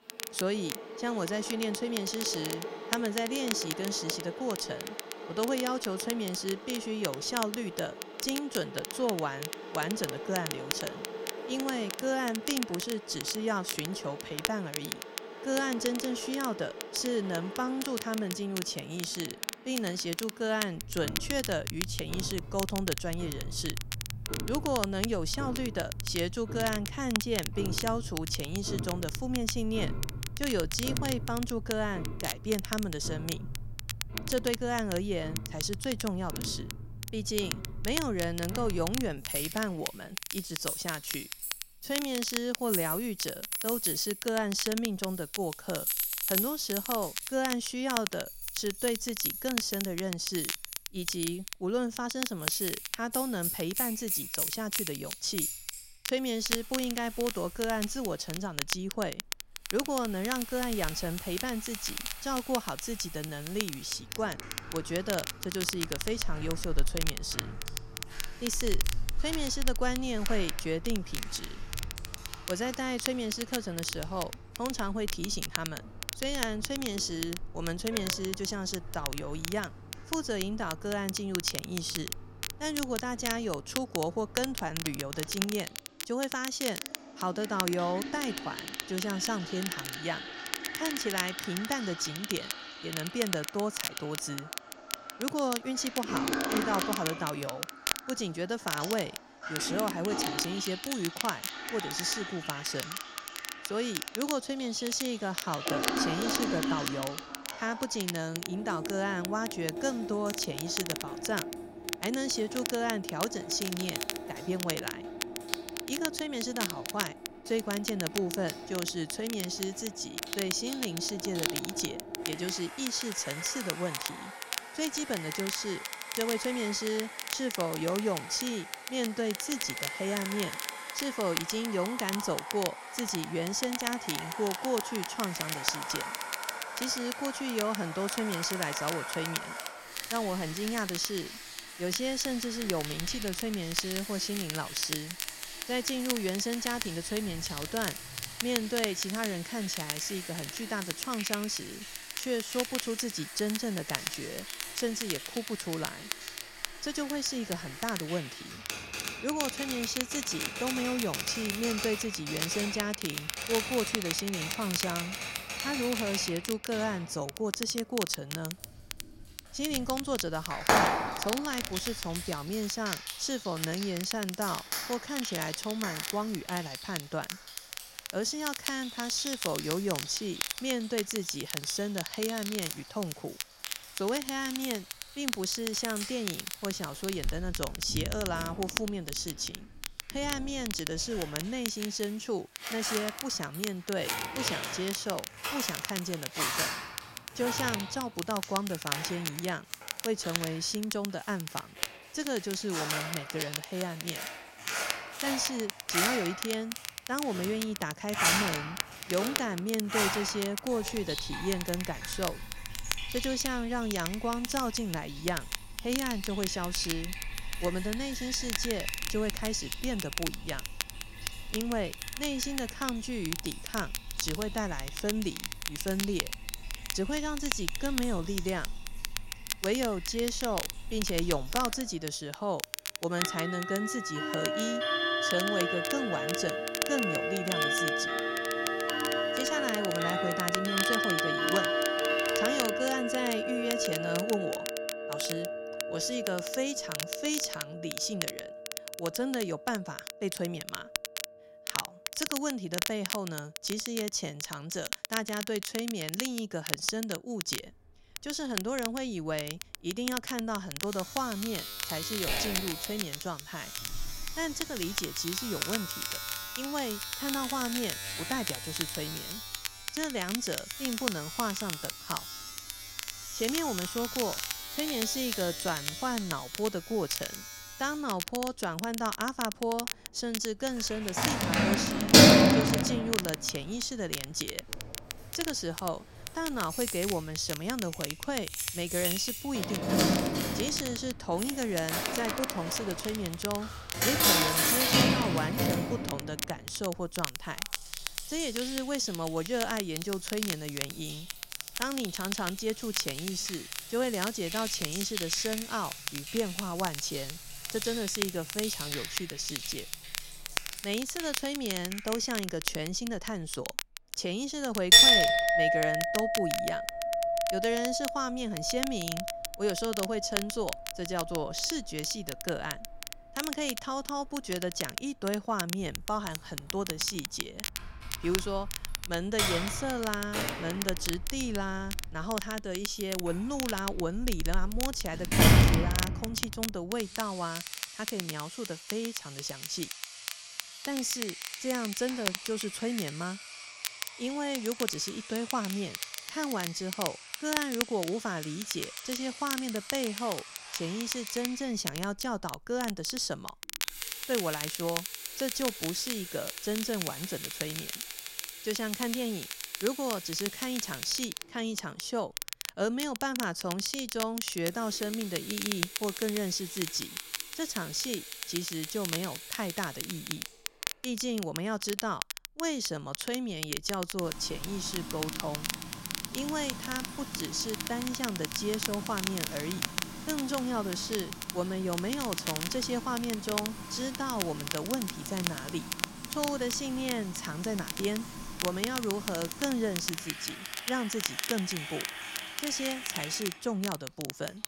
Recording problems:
household noises; loud; throughout; 1 dB below the speech
crackle, like an old record; loud; 4 dB below the speech

